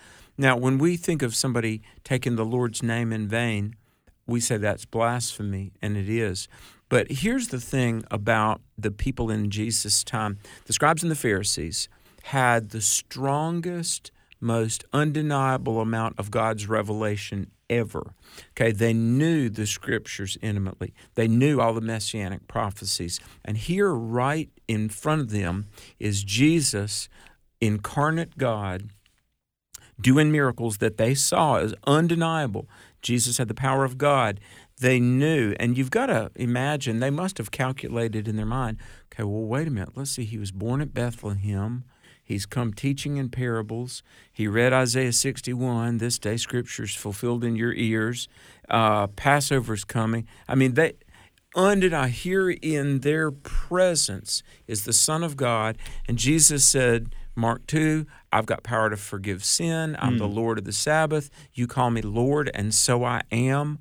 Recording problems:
uneven, jittery; strongly; from 5 s to 1:02

